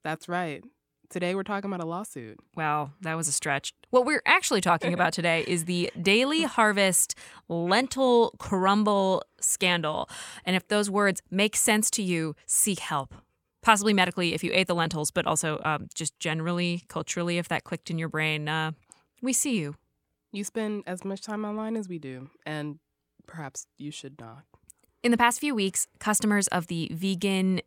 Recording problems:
none

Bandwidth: 17.5 kHz